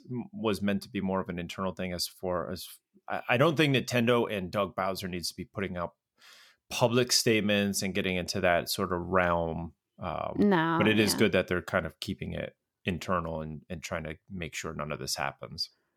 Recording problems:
none

